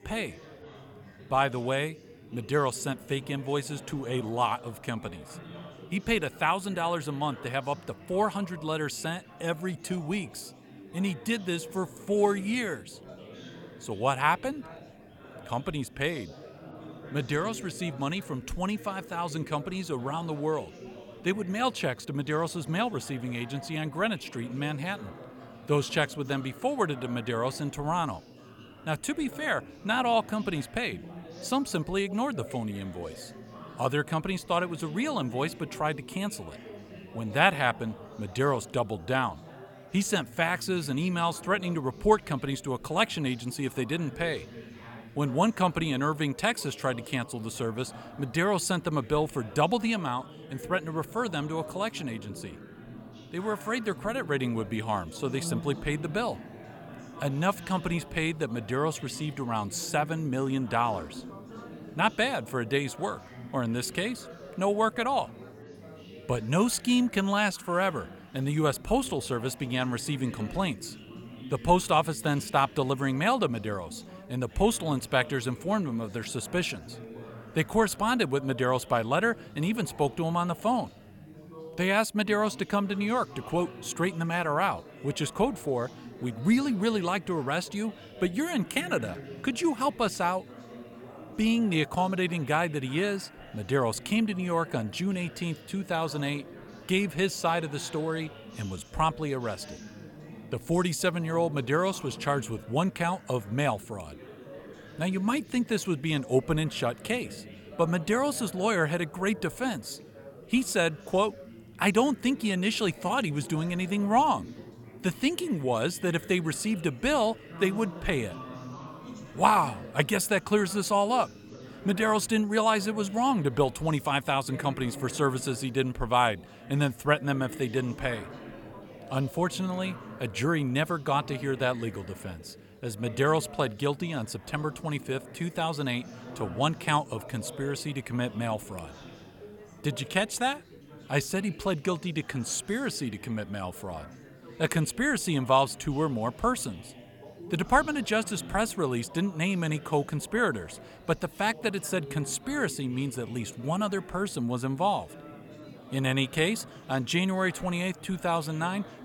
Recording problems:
chatter from many people; noticeable; throughout; 15 dB below the speech

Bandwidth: 17.5 kHz